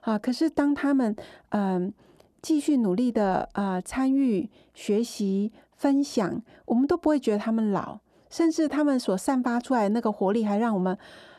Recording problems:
muffled; slightly; fading above 1.5 kHz

